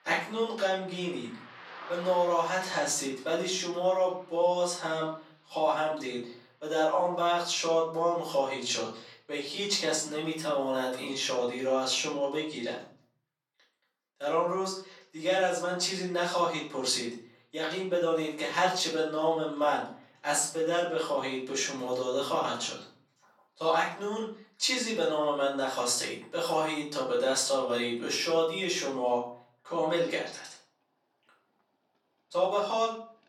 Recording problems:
off-mic speech; far
thin; somewhat; fading below 350 Hz
room echo; slight; dies away in 0.5 s
traffic noise; faint; throughout; 20 dB below the speech

